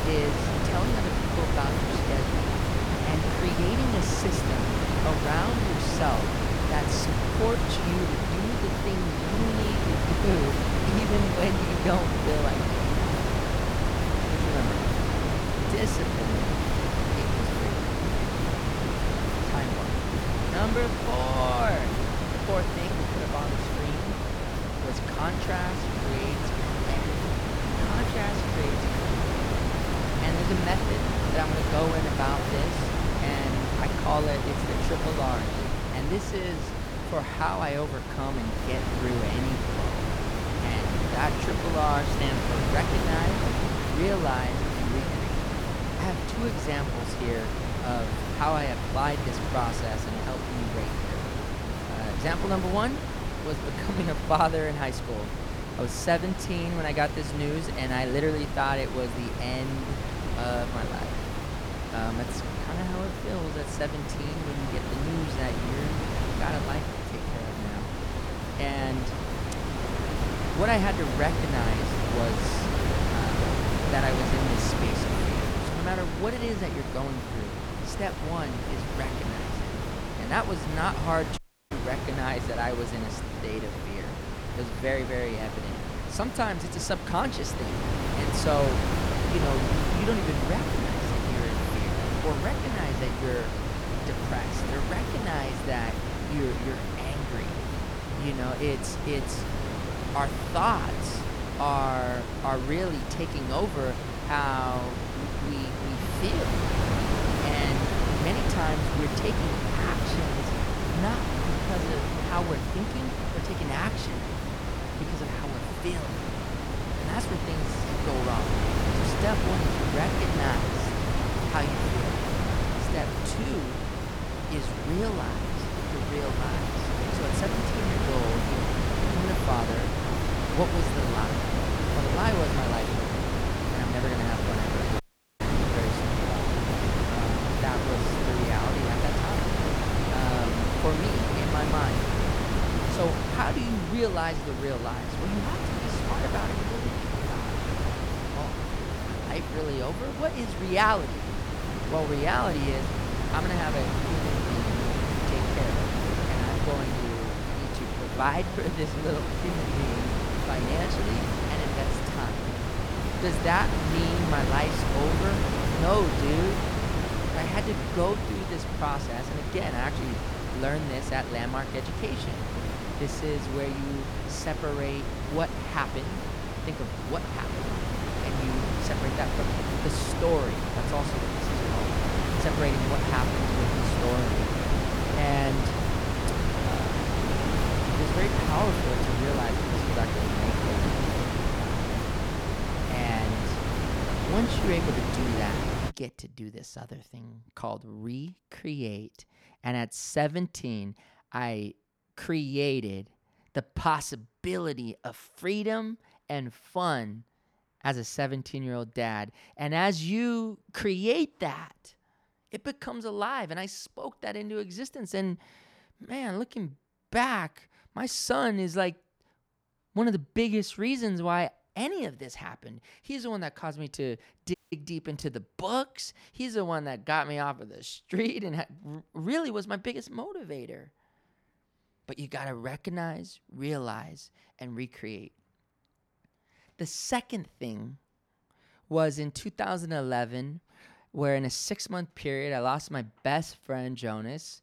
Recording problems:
wind noise on the microphone; heavy; until 3:16; as loud as the speech
audio cutting out; at 1:21, at 2:15 and at 3:45

